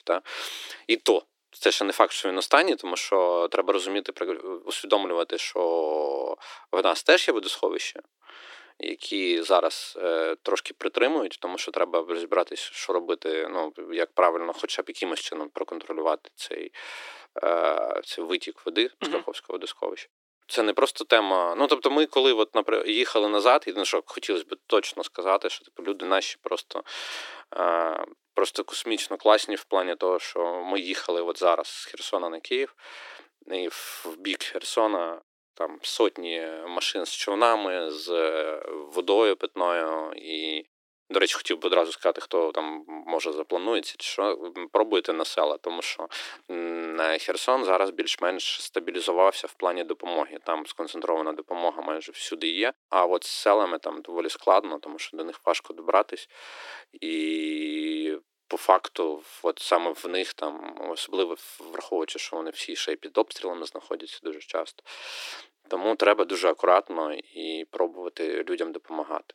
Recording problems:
thin; very; fading below 300 Hz

